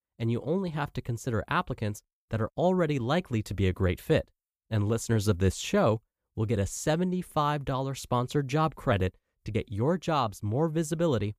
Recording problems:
none

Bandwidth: 15 kHz